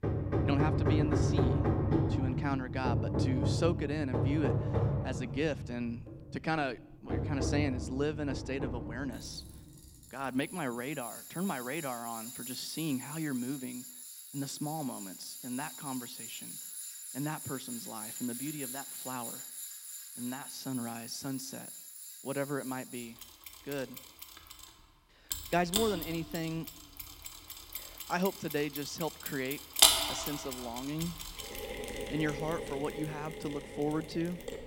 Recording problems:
machinery noise; very loud; throughout; 2 dB above the speech

